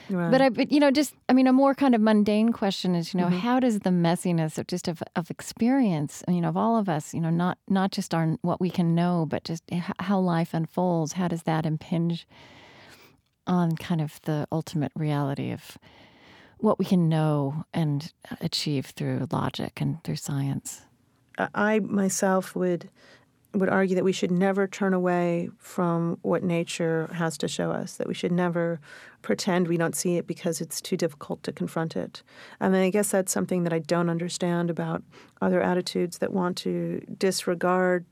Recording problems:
none

